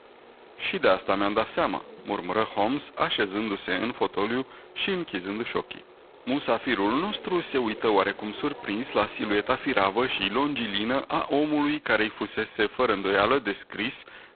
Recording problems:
phone-call audio; poor line; nothing above 4 kHz
traffic noise; faint; throughout; 20 dB below the speech

